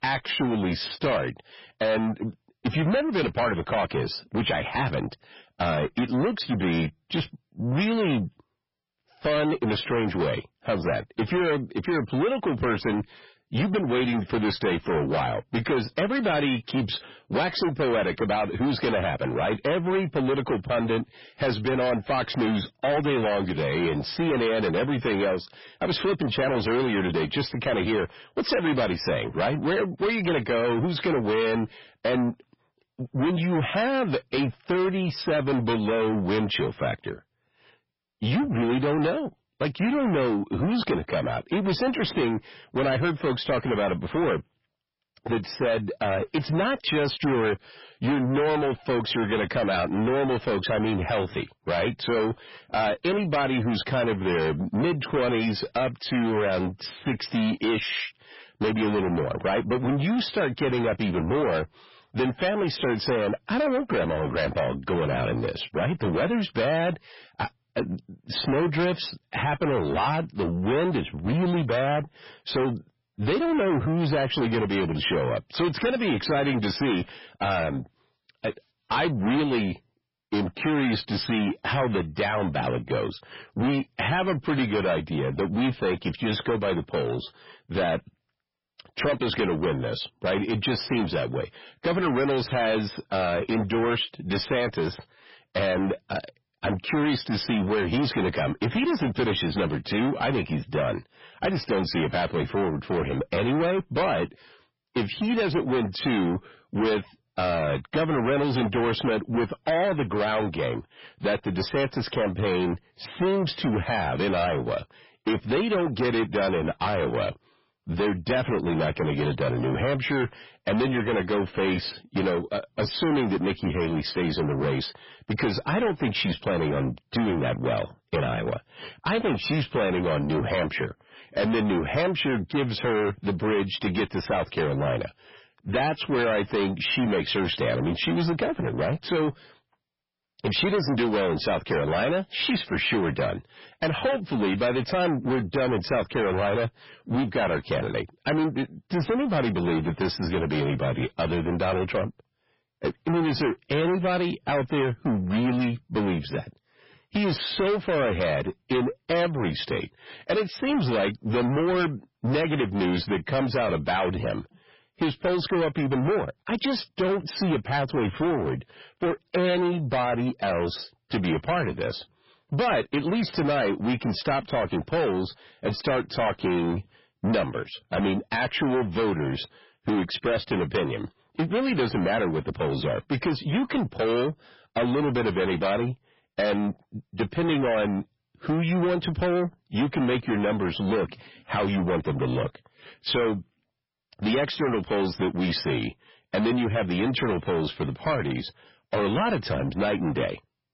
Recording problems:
distortion; heavy; 6 dB below the speech
garbled, watery; badly; nothing above 5.5 kHz

